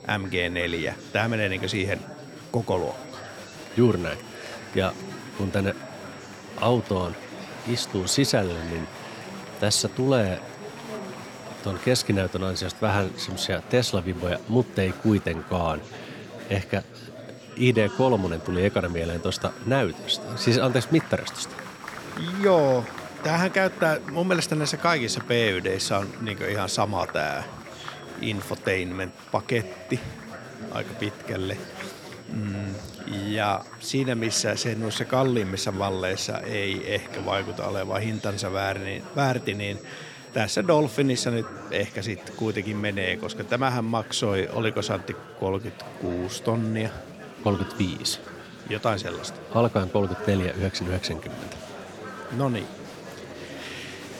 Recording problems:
chatter from many people; noticeable; throughout; 15 dB below the speech
high-pitched whine; faint; until 13 s and from 17 to 42 s; 5.5 kHz, 25 dB below the speech

